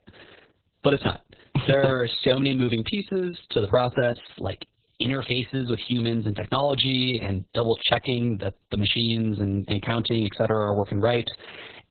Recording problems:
garbled, watery; badly; nothing above 4 kHz

